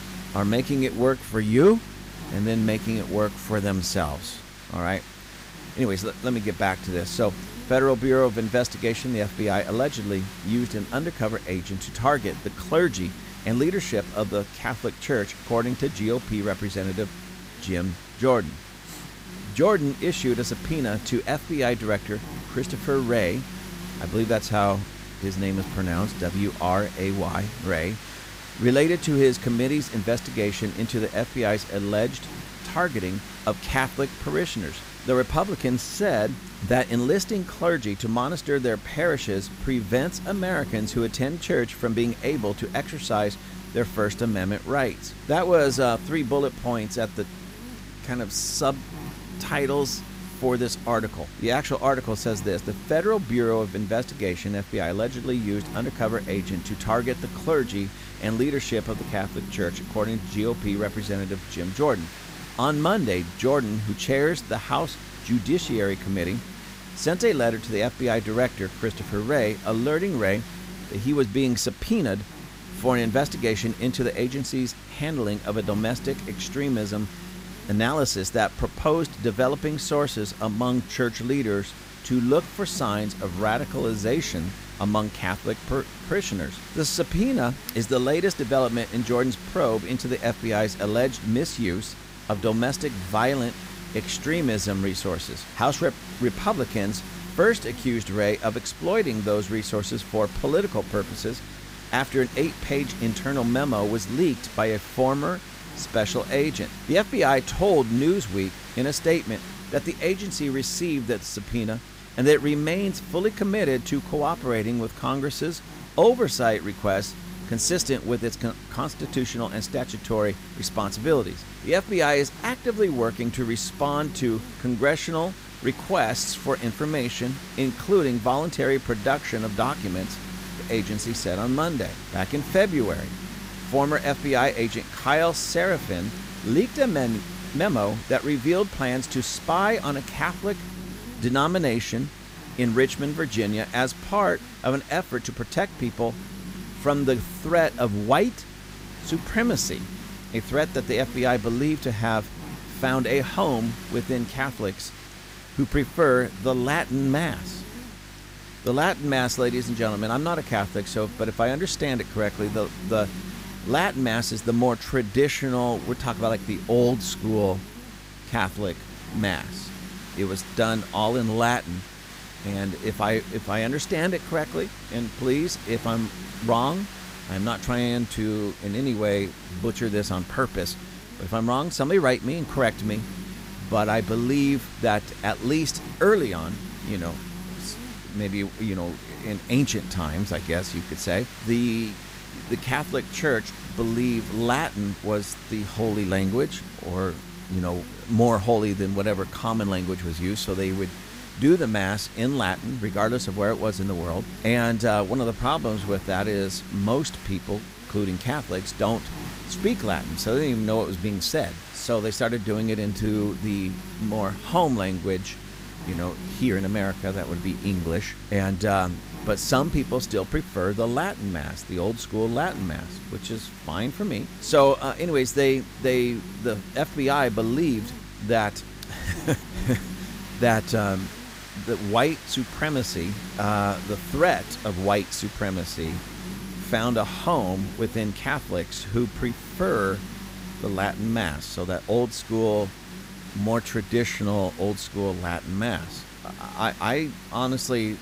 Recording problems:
hiss; noticeable; throughout; 15 dB below the speech
electrical hum; faint; throughout; 50 Hz, 20 dB below the speech

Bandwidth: 15.5 kHz